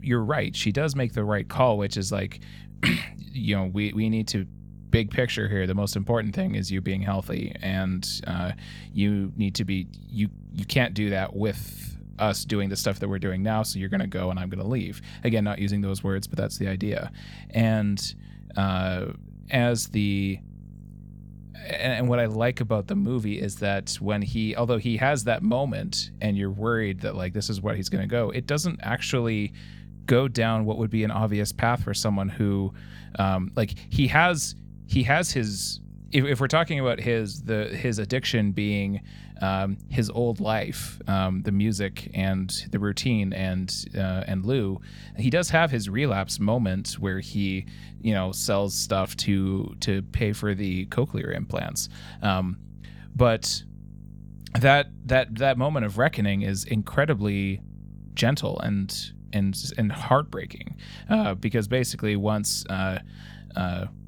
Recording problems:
electrical hum; faint; throughout; 50 Hz, 25 dB below the speech

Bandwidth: 18.5 kHz